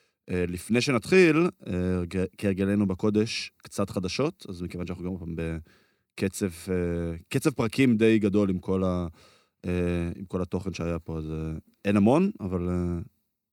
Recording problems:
none

